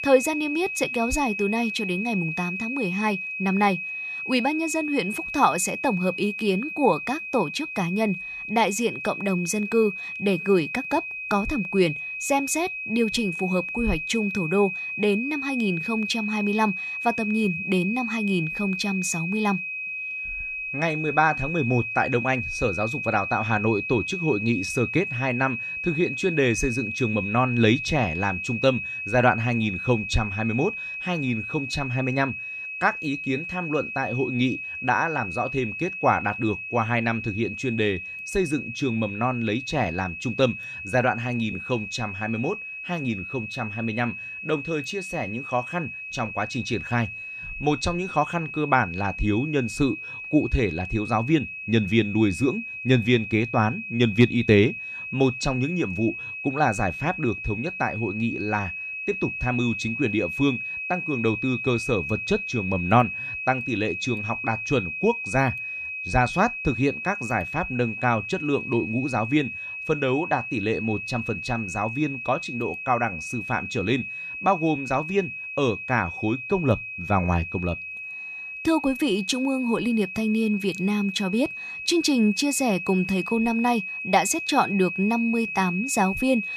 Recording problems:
high-pitched whine; loud; throughout; 2.5 kHz, 5 dB below the speech

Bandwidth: 14 kHz